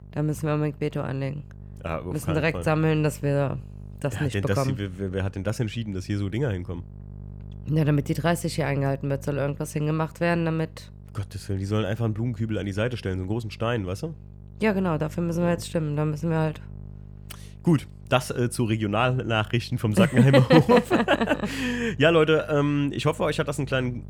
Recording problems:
electrical hum; faint; throughout; 50 Hz, 30 dB below the speech

